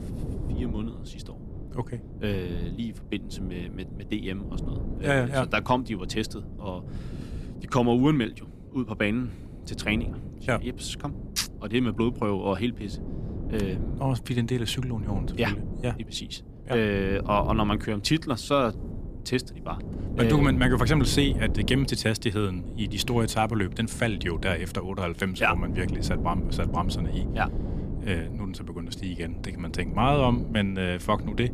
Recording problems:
wind noise on the microphone; occasional gusts; 15 dB below the speech

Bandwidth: 15 kHz